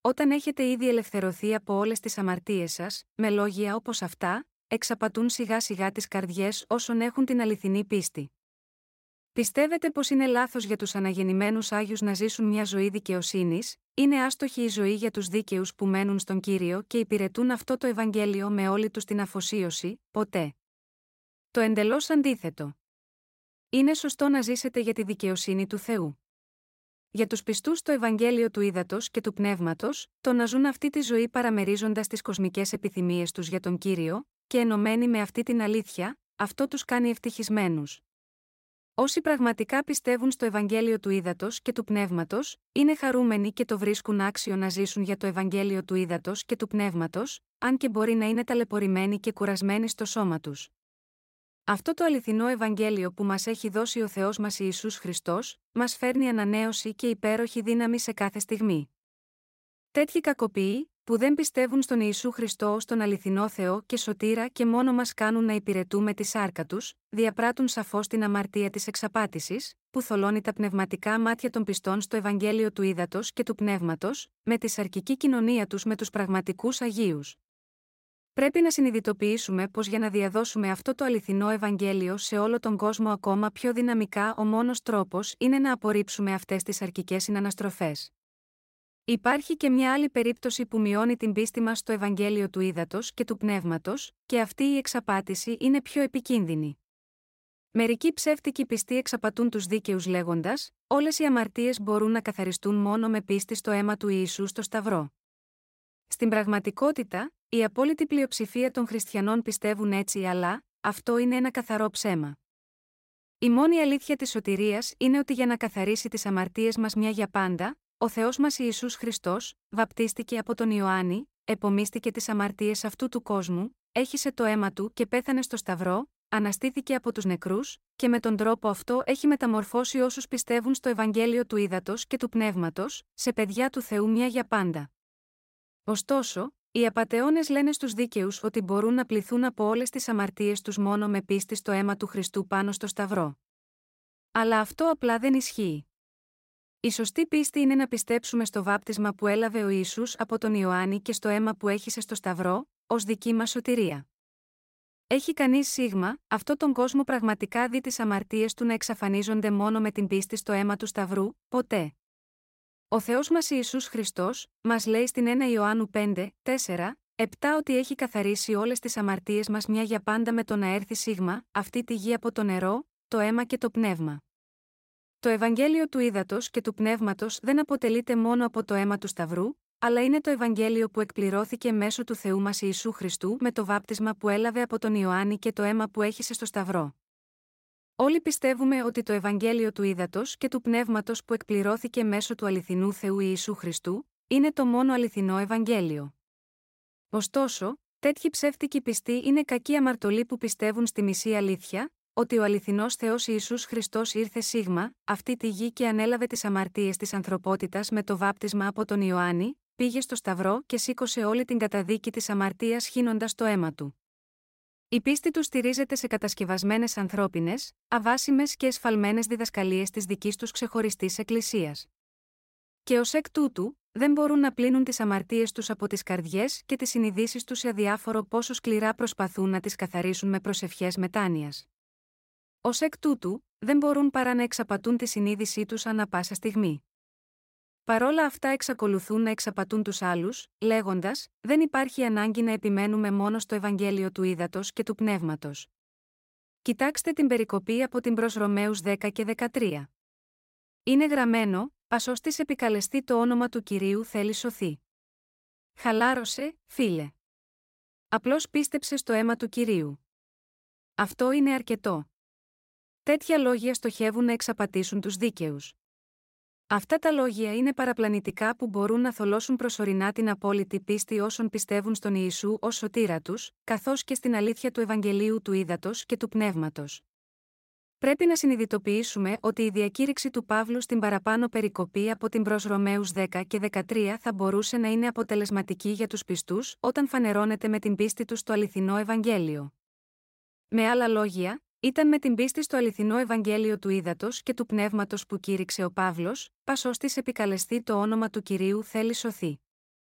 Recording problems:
none

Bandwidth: 16 kHz